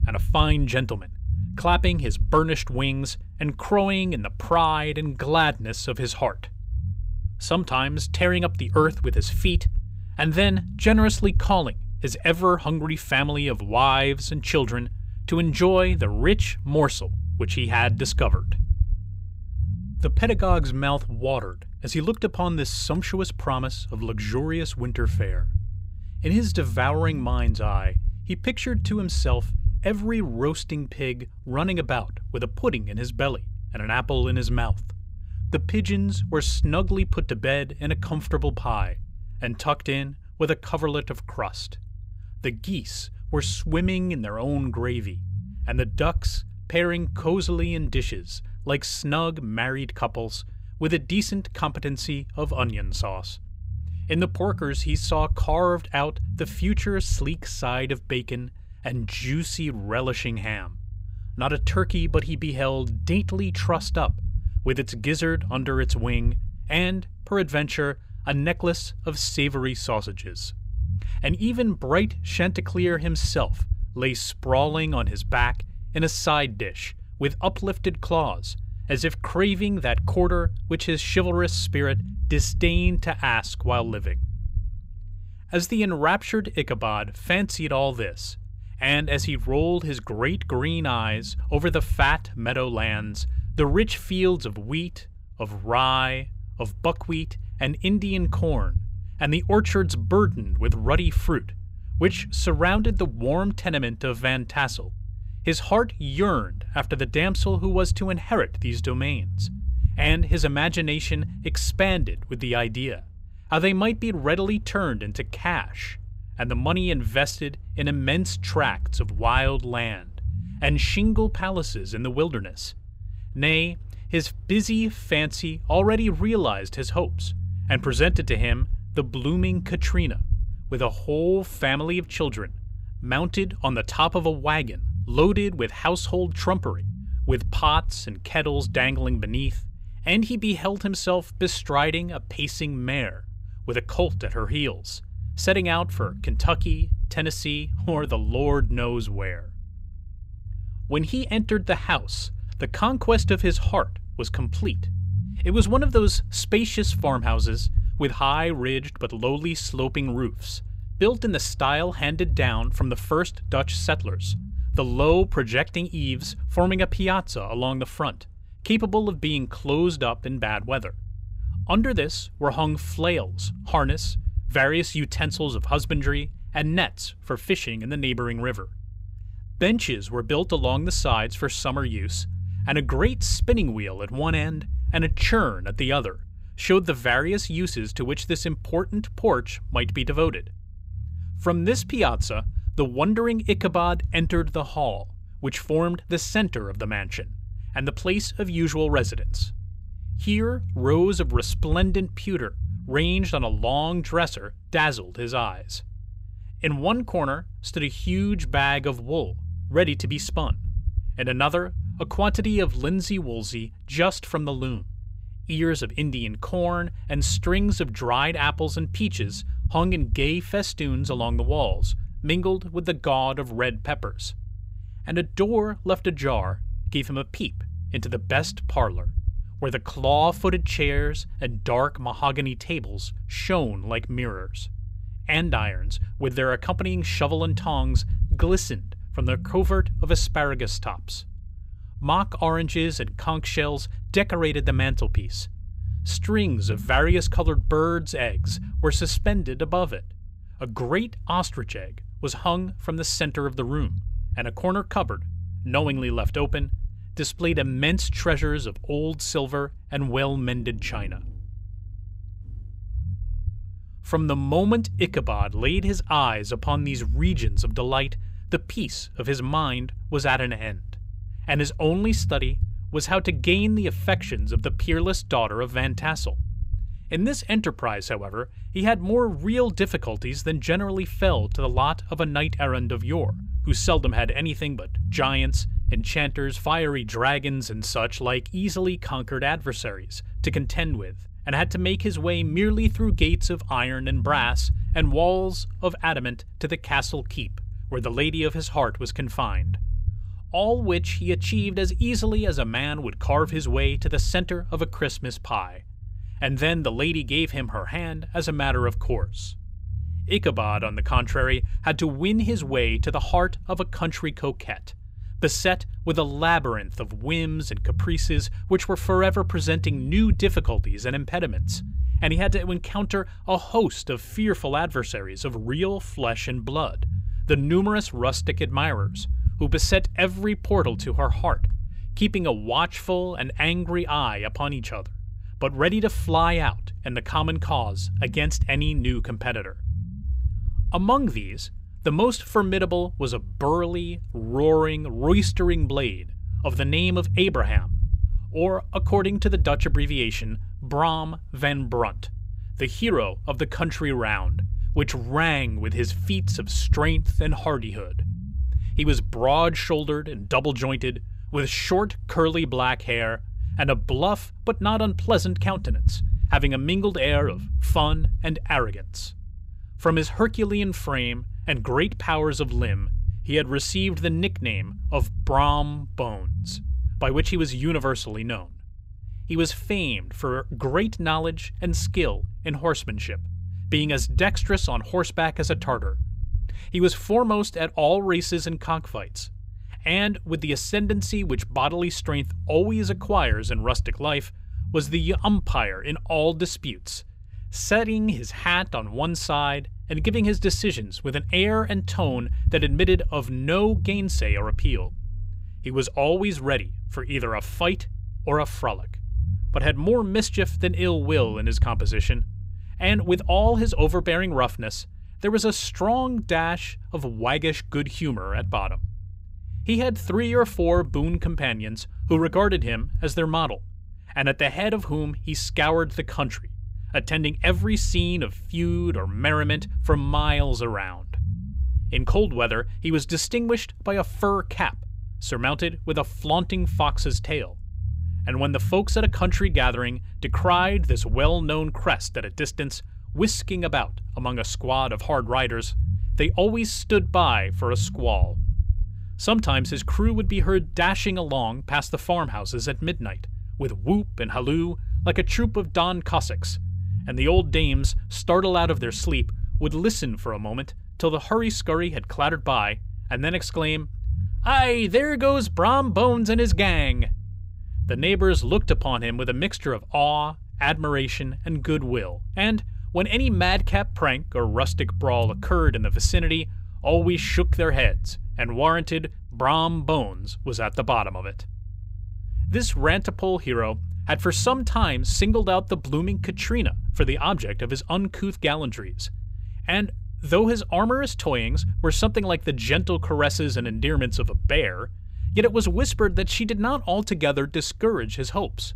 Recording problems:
low rumble; faint; throughout; 20 dB below the speech

